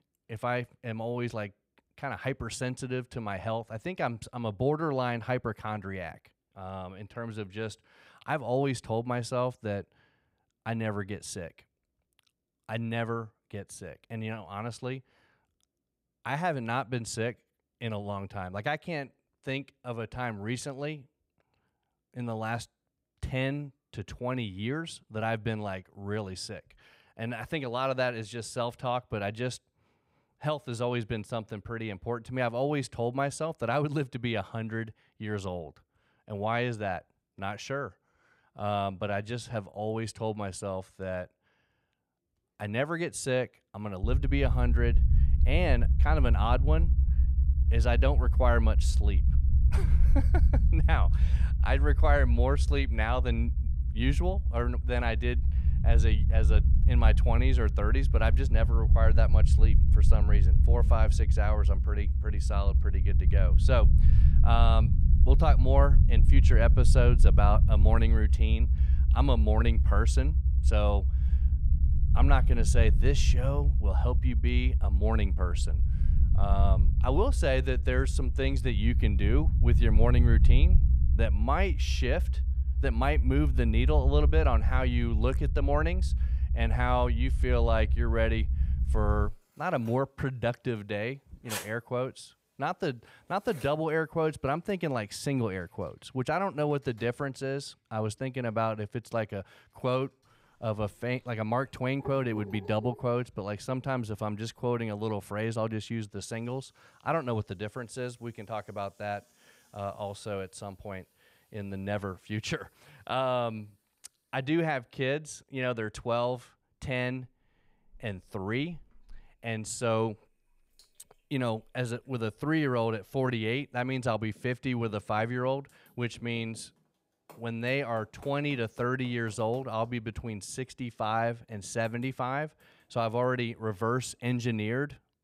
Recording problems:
household noises; noticeable; from 1:28 on; 20 dB below the speech
low rumble; noticeable; from 44 s to 1:29; 10 dB below the speech

